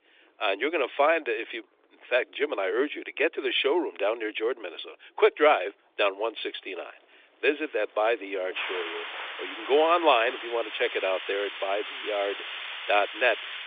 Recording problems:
thin; very; fading below 350 Hz
phone-call audio
rain or running water; loud; throughout; 9 dB below the speech

